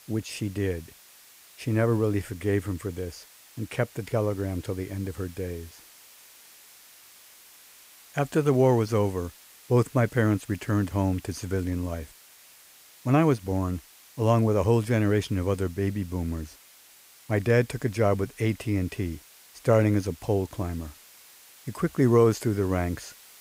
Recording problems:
hiss; faint; throughout; 25 dB below the speech

